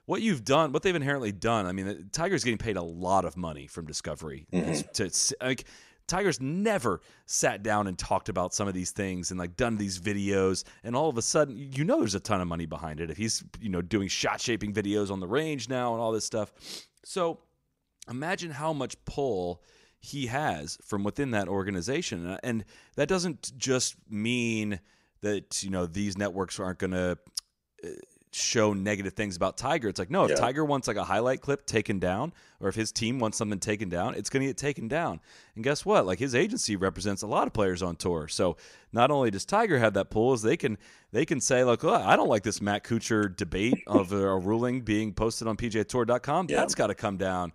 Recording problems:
none

